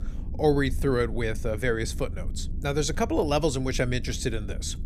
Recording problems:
low rumble; faint; throughout; 20 dB below the speech

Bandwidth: 15 kHz